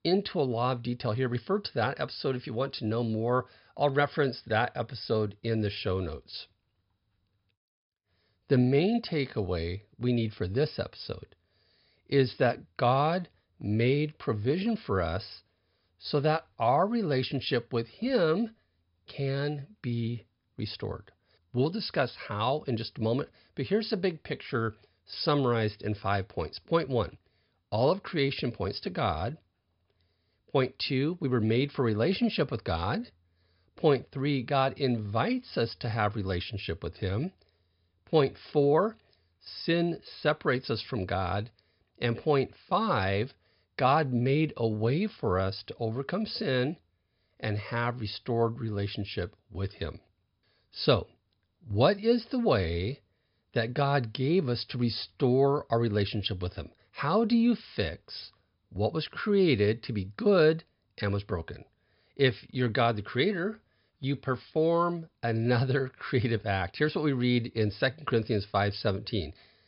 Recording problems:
high frequencies cut off; noticeable; nothing above 5.5 kHz

